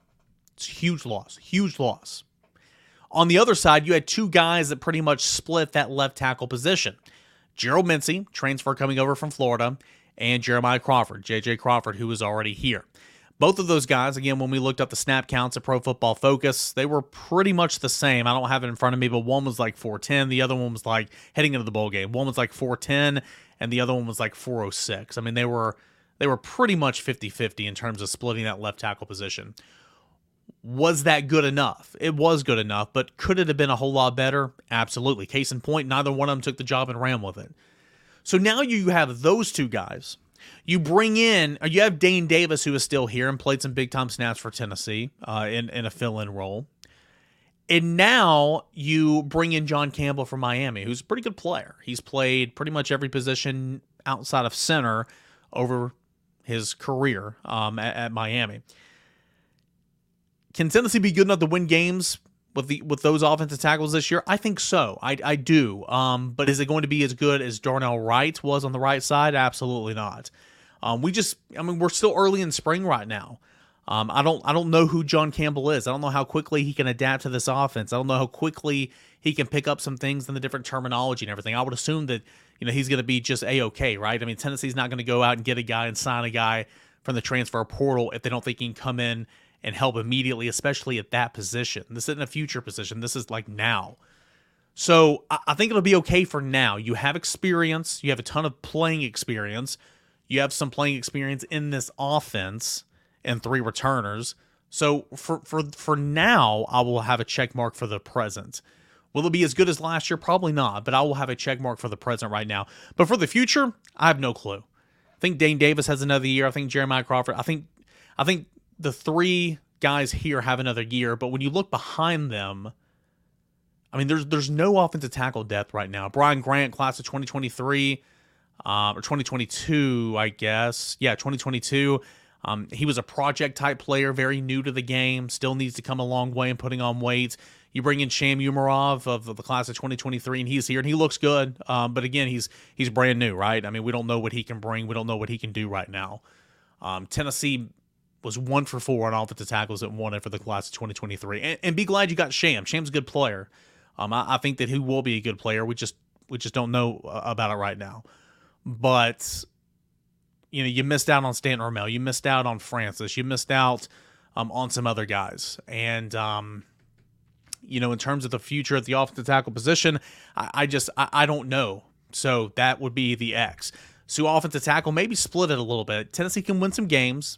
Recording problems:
none

